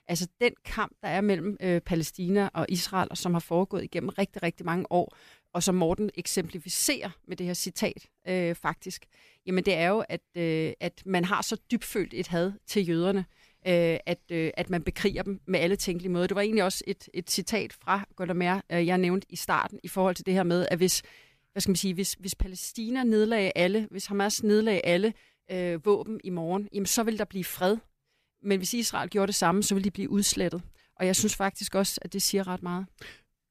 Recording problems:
none

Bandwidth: 14.5 kHz